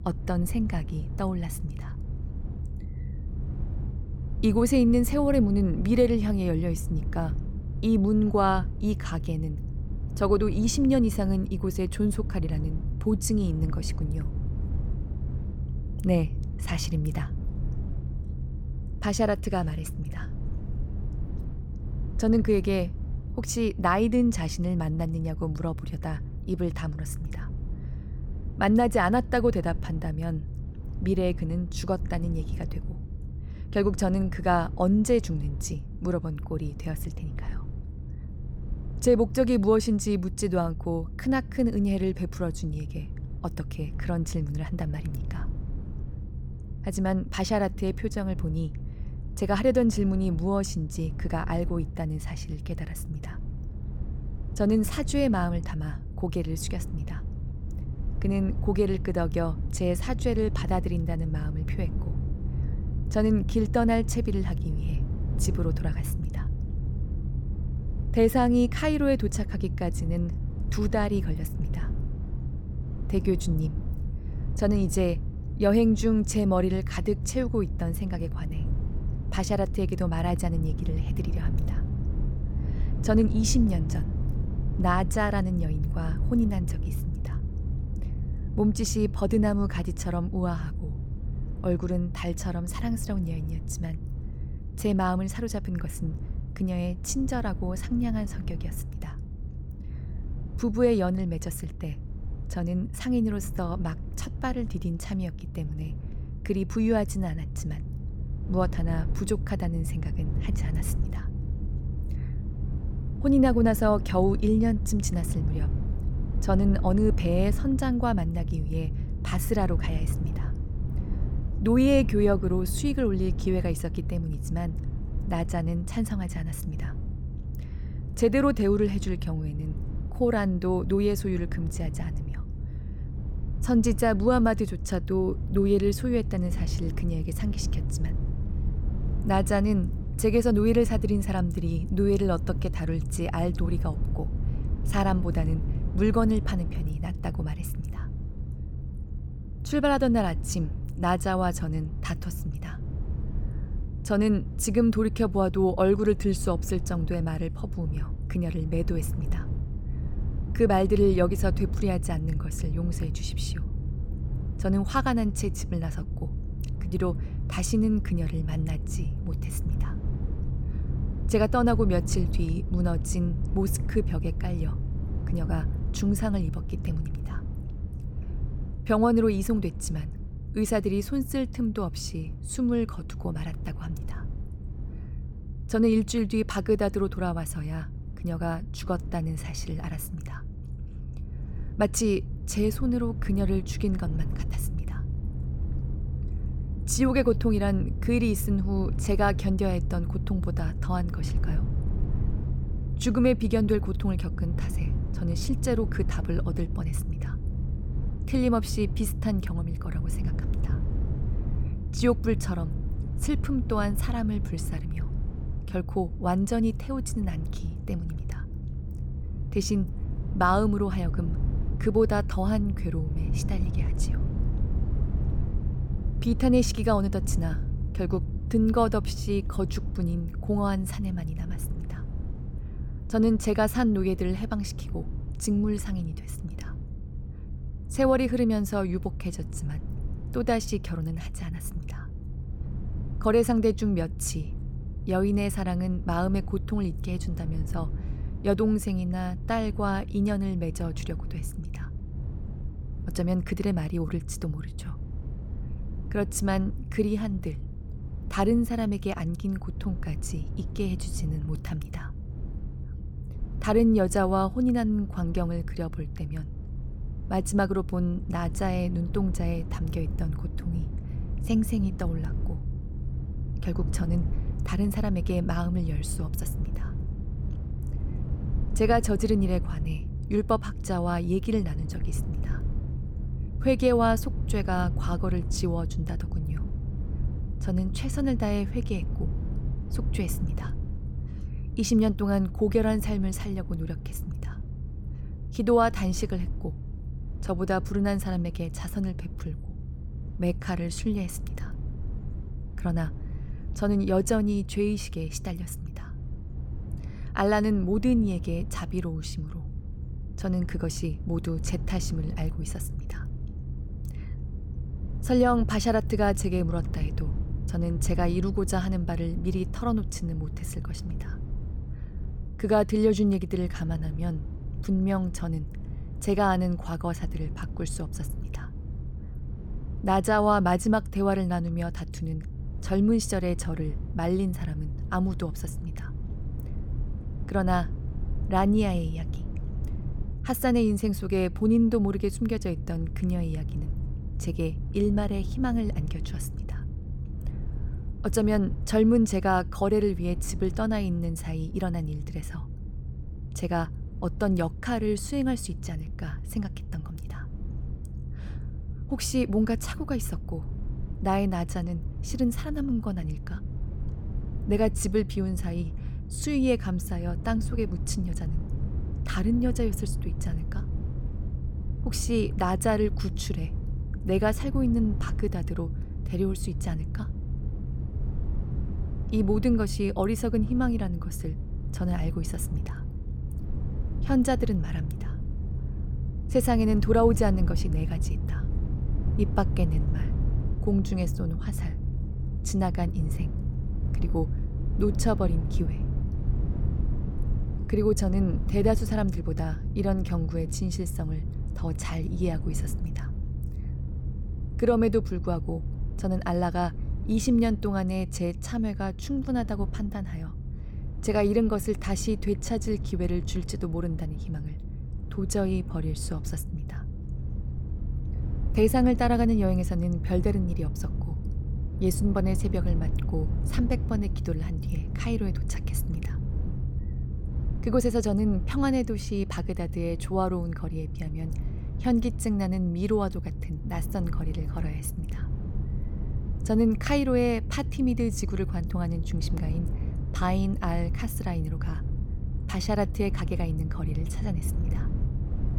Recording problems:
low rumble; noticeable; throughout; 15 dB below the speech

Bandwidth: 17.5 kHz